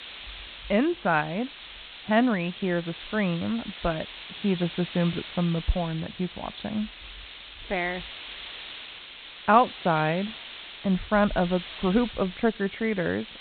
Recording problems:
high frequencies cut off; severe; nothing above 4 kHz
hiss; noticeable; throughout; 15 dB below the speech

